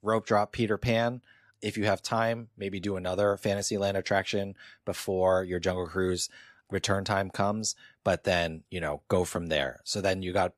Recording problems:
none

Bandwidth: 14.5 kHz